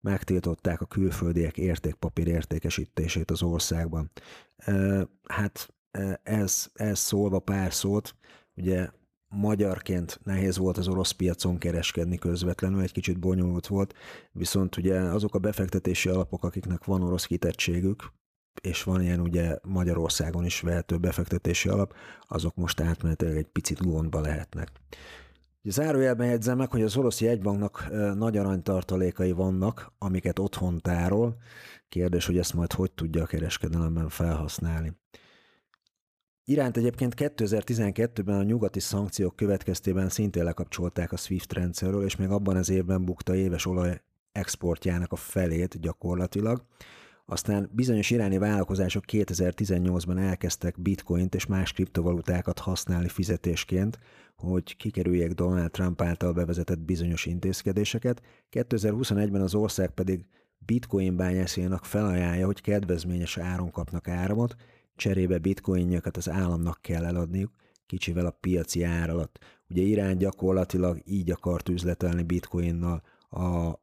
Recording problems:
none

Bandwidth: 14.5 kHz